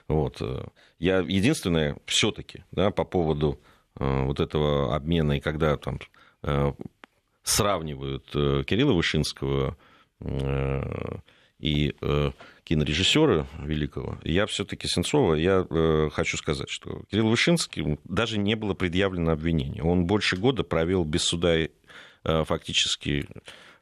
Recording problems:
none

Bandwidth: 13.5 kHz